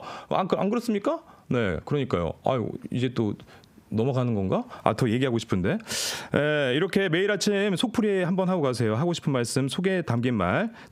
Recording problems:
squashed, flat; heavily

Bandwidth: 15.5 kHz